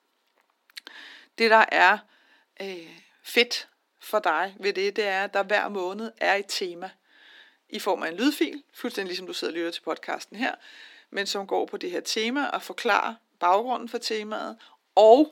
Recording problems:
thin; somewhat; fading below 250 Hz

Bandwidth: 18 kHz